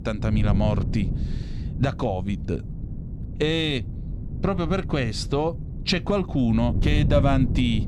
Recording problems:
wind noise on the microphone; occasional gusts; 15 dB below the speech

